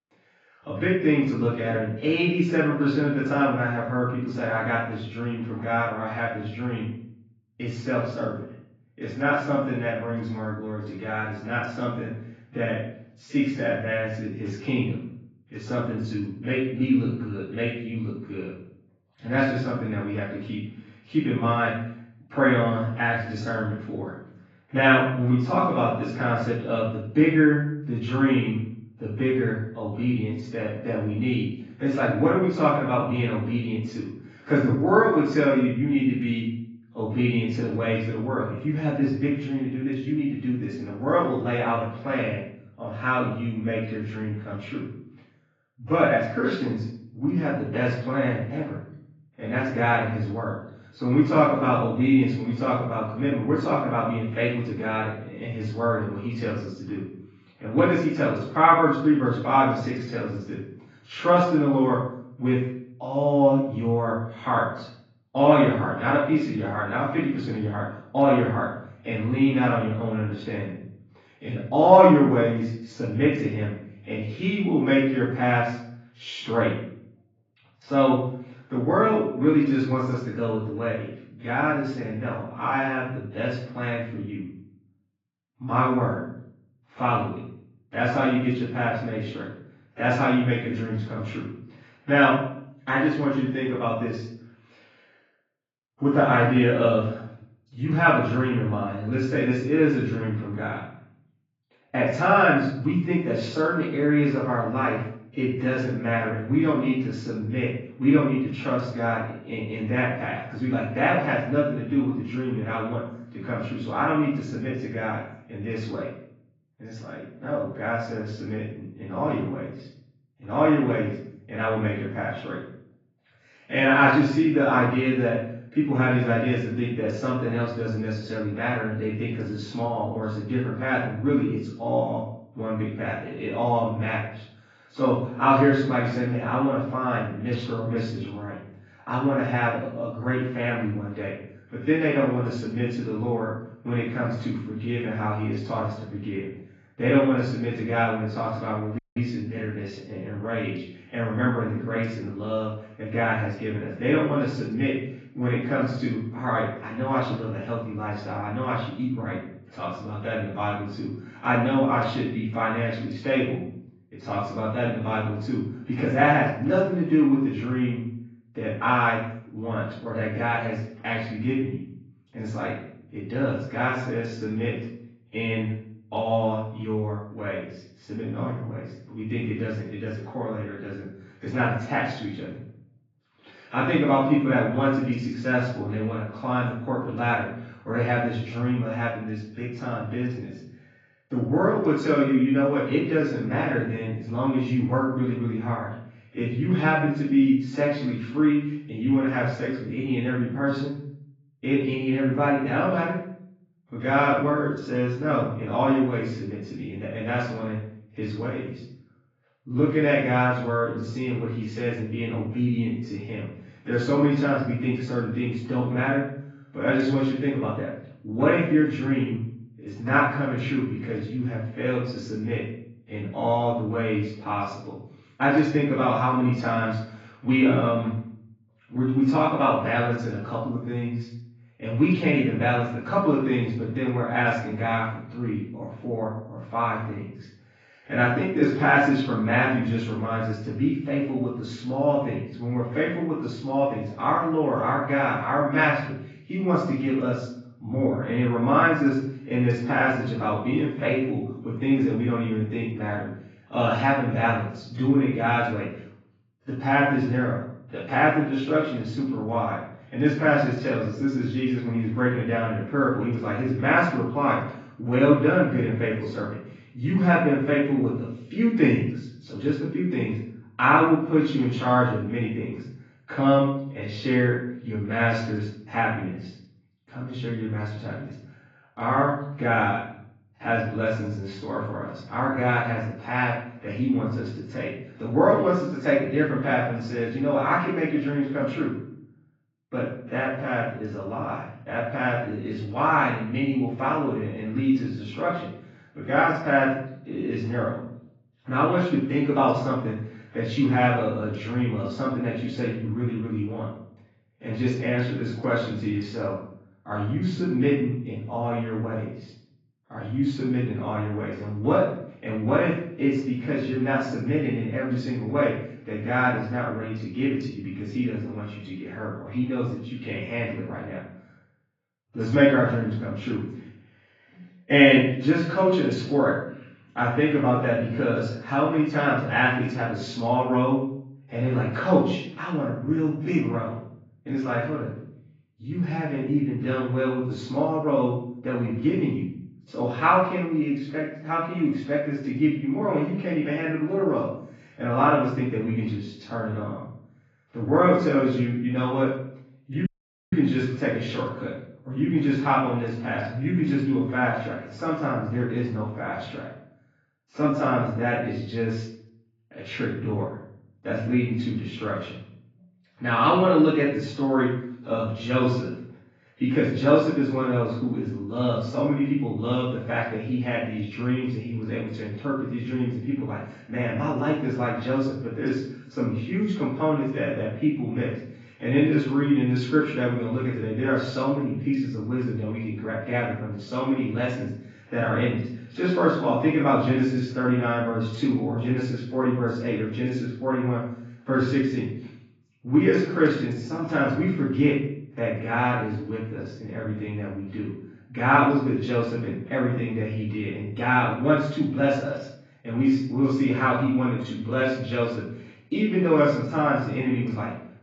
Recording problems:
off-mic speech; far
garbled, watery; badly
room echo; noticeable; dies away in 0.6 s
muffled; slightly; fading above 2.5 kHz
audio cutting out; at 2:29 and at 5:50

